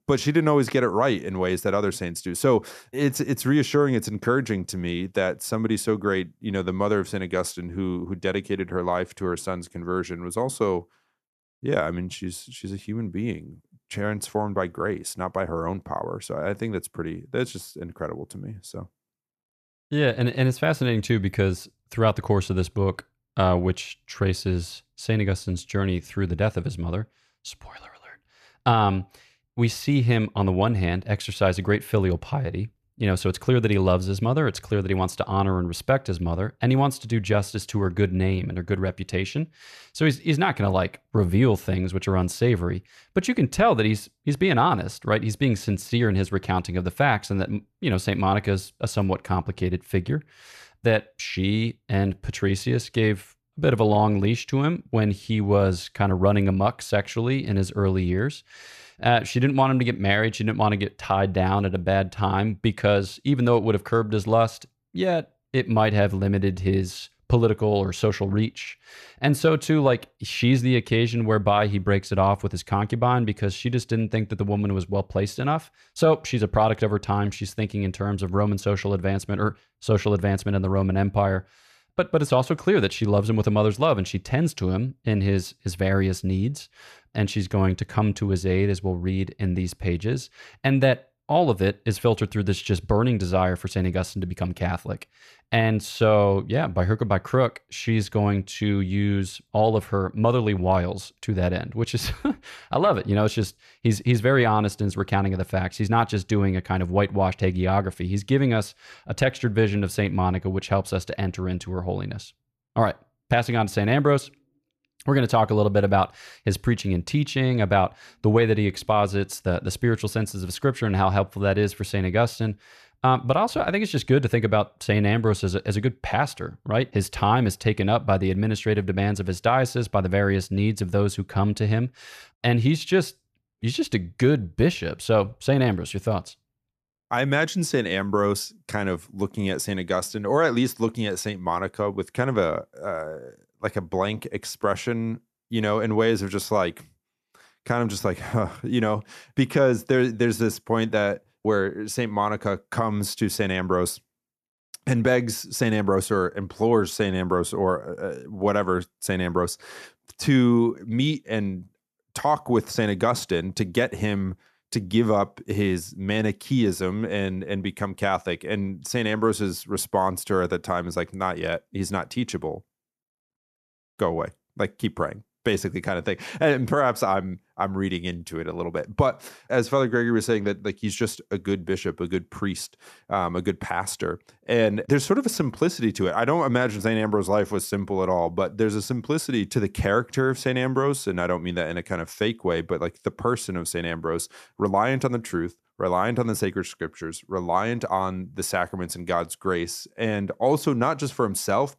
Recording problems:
none

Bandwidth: 14 kHz